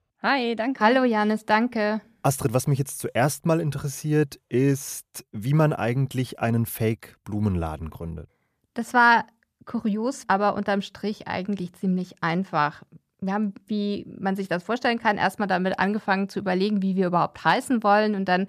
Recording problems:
none

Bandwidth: 14.5 kHz